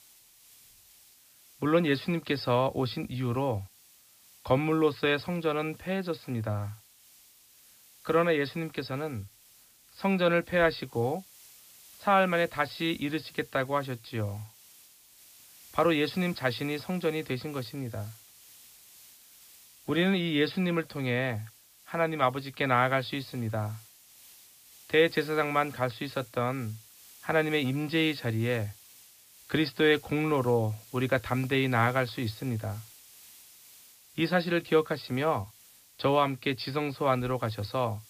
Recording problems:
high frequencies cut off; noticeable; nothing above 5.5 kHz
hiss; faint; throughout; 25 dB below the speech

